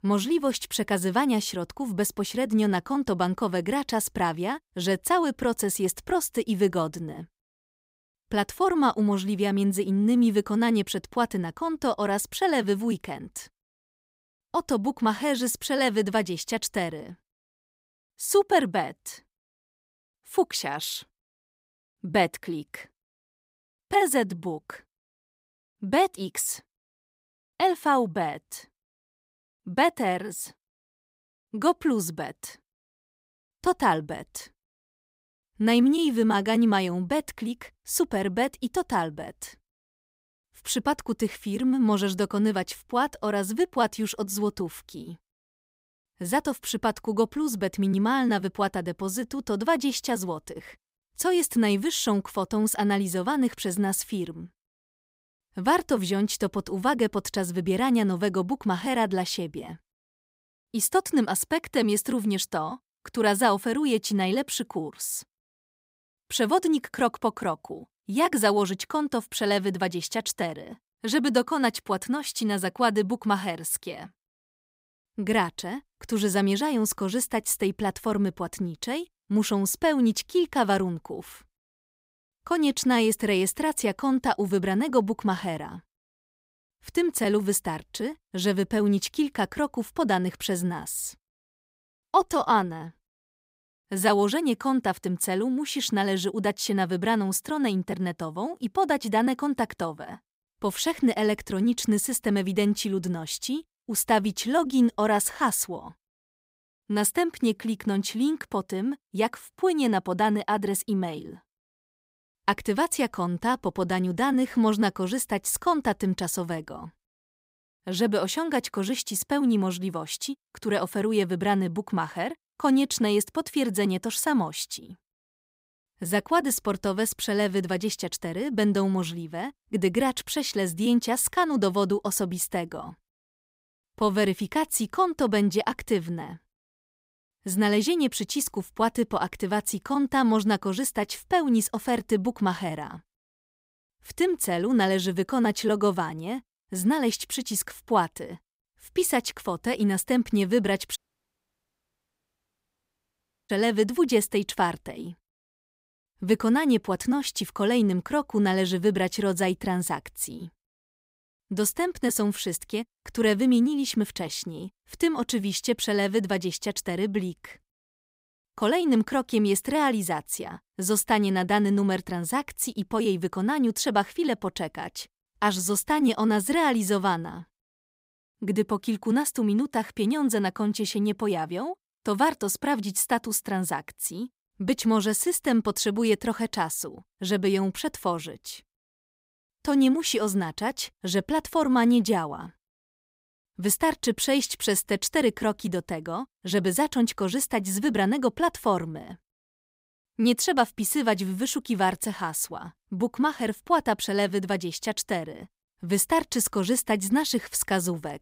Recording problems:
audio cutting out; at 2:31 for 2.5 s

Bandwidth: 15.5 kHz